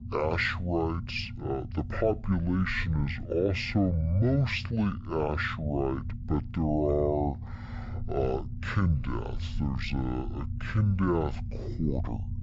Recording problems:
wrong speed and pitch; too slow and too low; 0.5 times normal speed
low rumble; noticeable; throughout; 20 dB below the speech

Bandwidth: 7.5 kHz